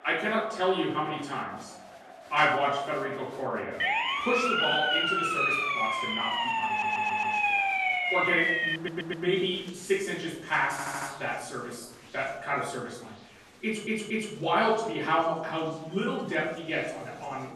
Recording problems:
off-mic speech; far
room echo; noticeable; dies away in 0.7 s
crowd noise; noticeable; throughout; 20 dB below the speech
siren; loud; from 4 to 9 s; peak 6 dB above the speech
audio stuttering; 4 times, first at 6.5 s

